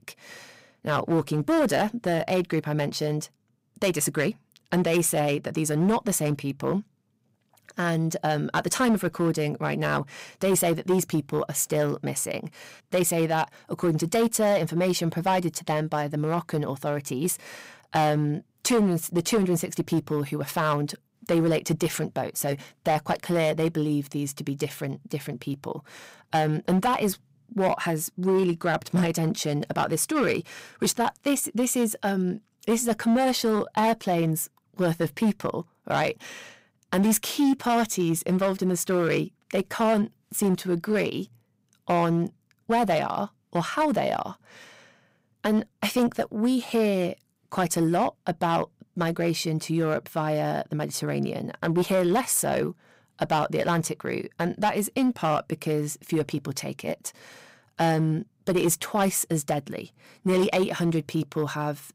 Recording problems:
distortion; slight; 6% of the sound clipped

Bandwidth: 15.5 kHz